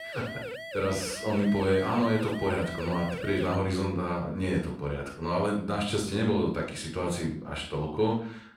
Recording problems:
off-mic speech; far
room echo; noticeable; dies away in 0.4 s
siren; noticeable; until 3.5 s; peak 8 dB below the speech

